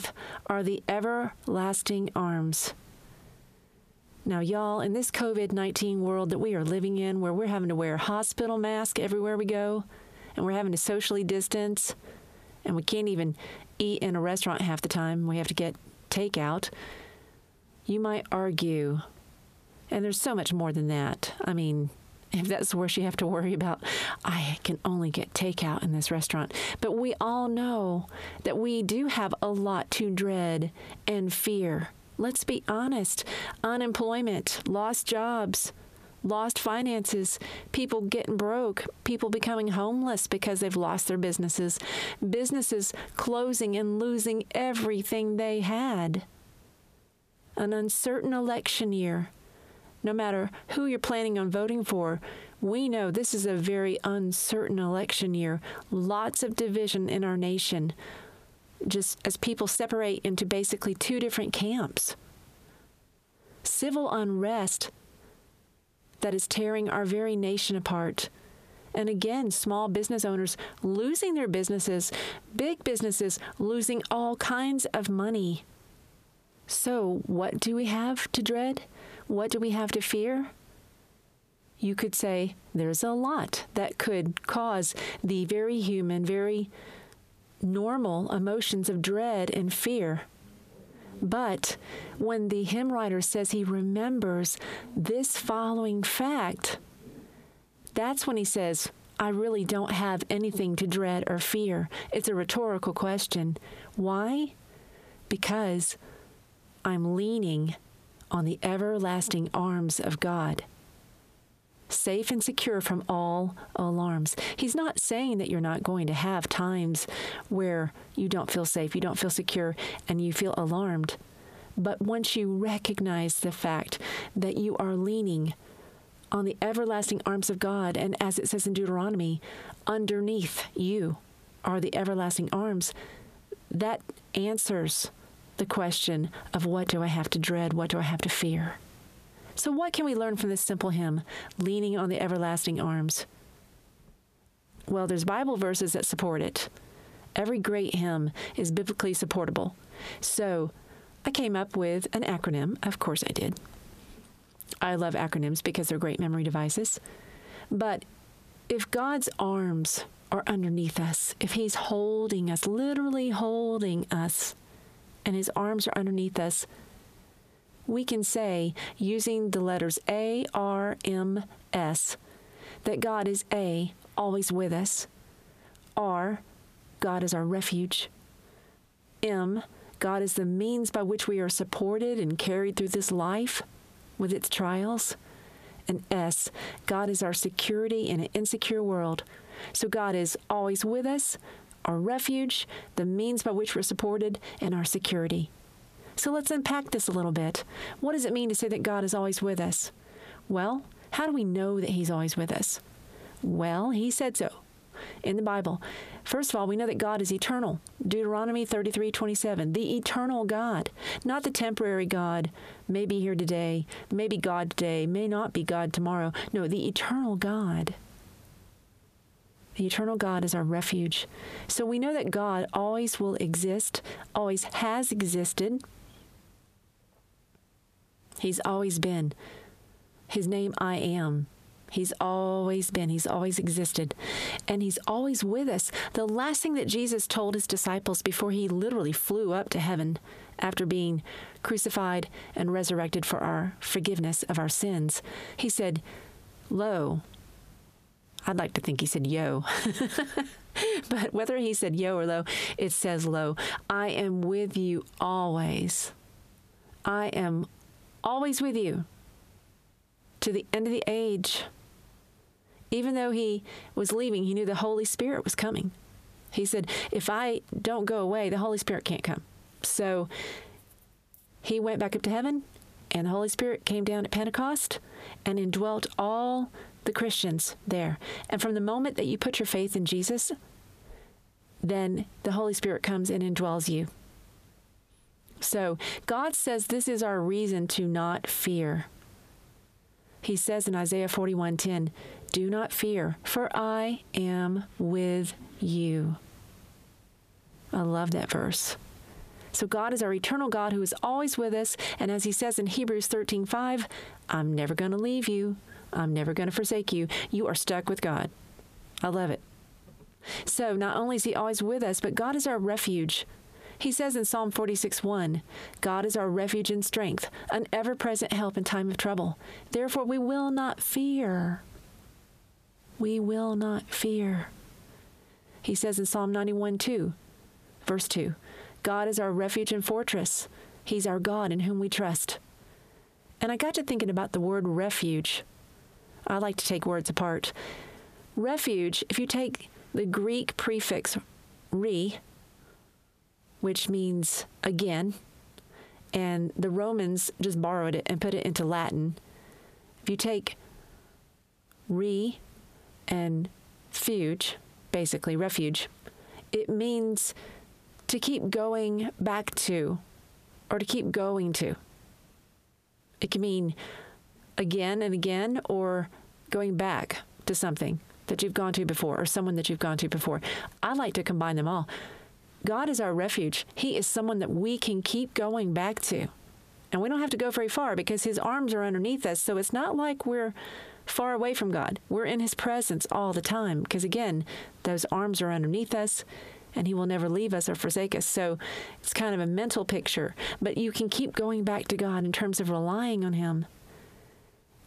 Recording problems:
squashed, flat; heavily

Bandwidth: 14.5 kHz